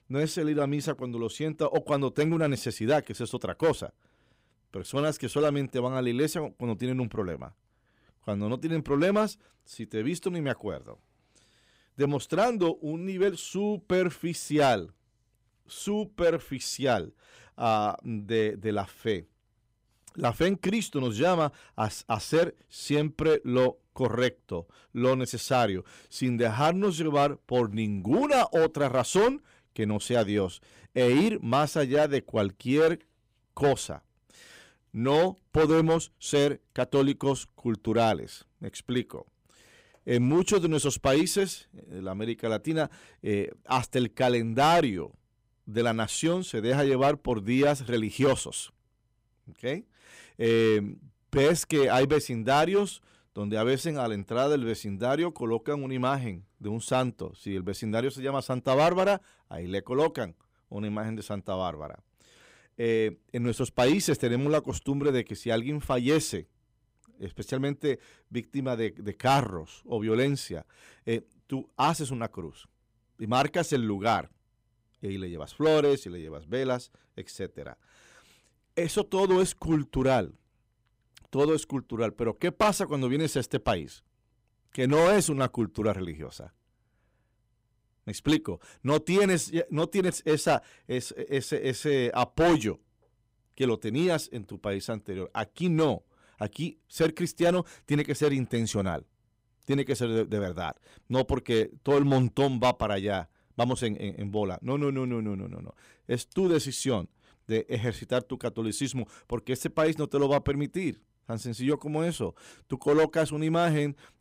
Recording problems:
distortion; slight; 3% of the sound clipped

